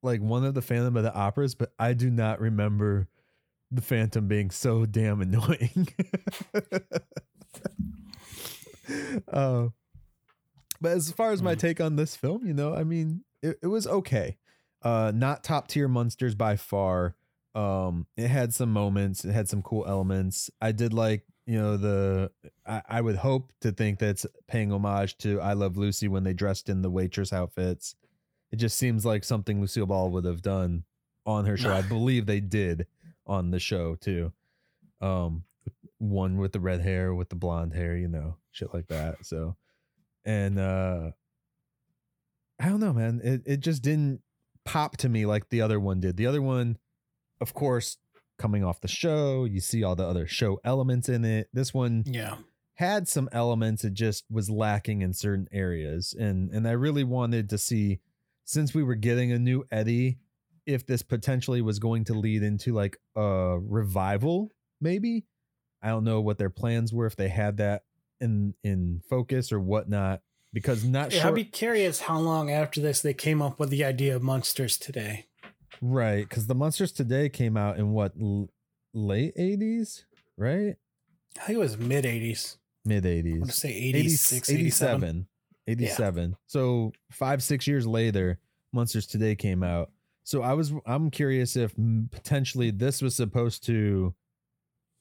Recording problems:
none

